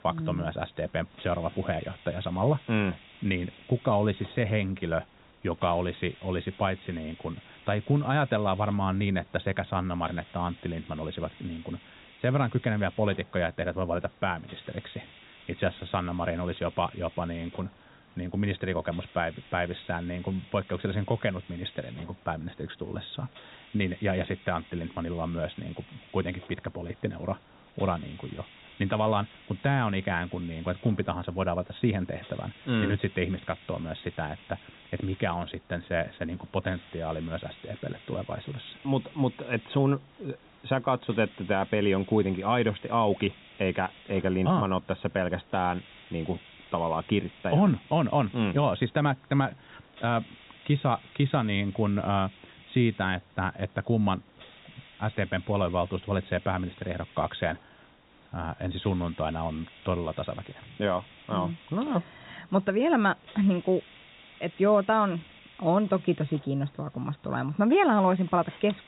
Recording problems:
high frequencies cut off; severe; nothing above 4 kHz
hiss; faint; throughout; 20 dB below the speech

